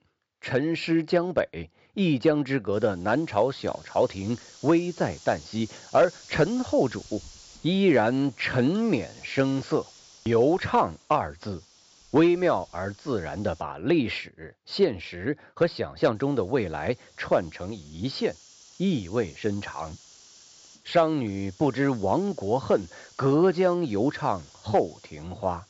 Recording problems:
high frequencies cut off; noticeable; nothing above 8 kHz
hiss; faint; from 2.5 to 14 s and from 16 s on; 25 dB below the speech

